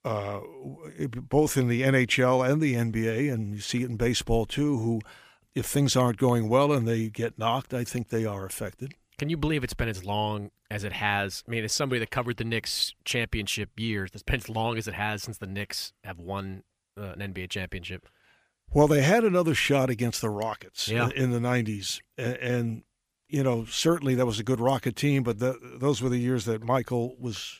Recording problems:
none

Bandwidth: 15 kHz